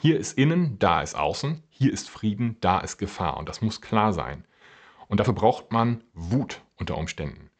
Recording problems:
high frequencies cut off; noticeable; nothing above 8 kHz
uneven, jittery; slightly; from 0.5 to 6.5 s

